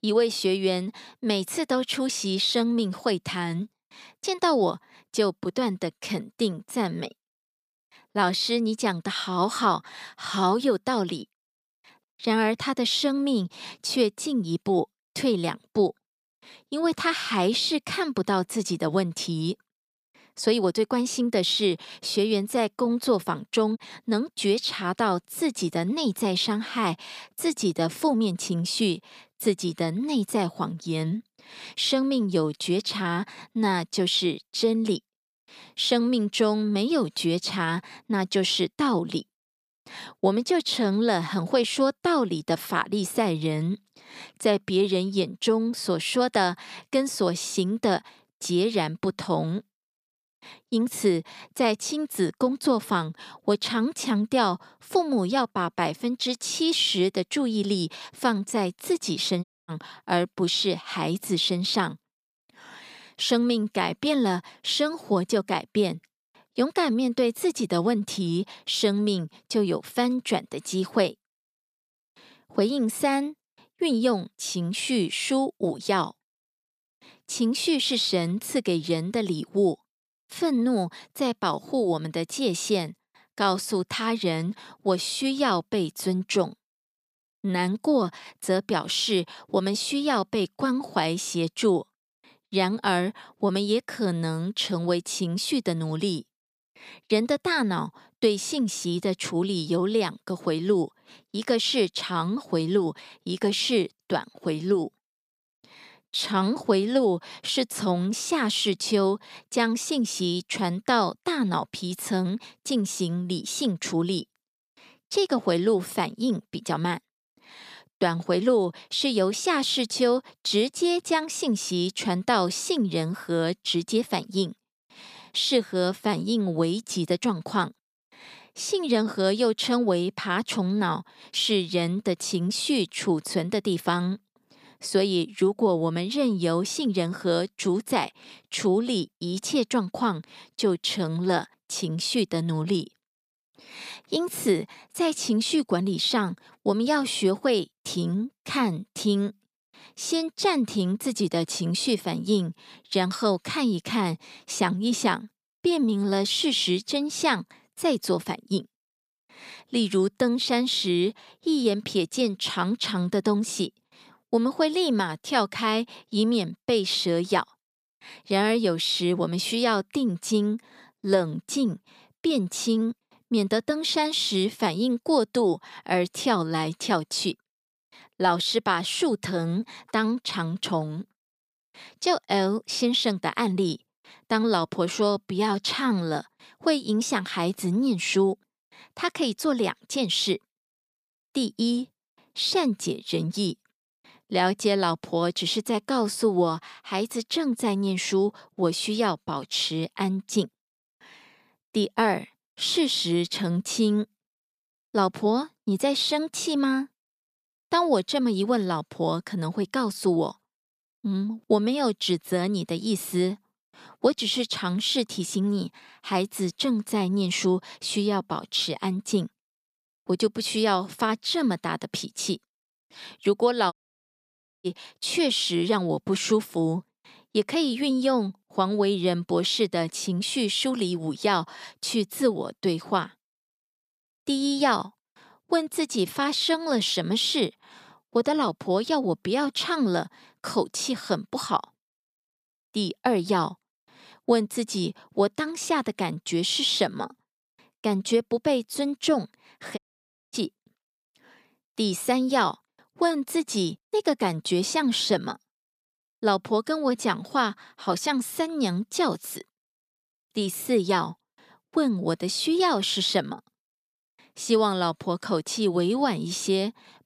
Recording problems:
audio cutting out; at 59 s, at 3:44 for 1 s and at 4:10 for 0.5 s

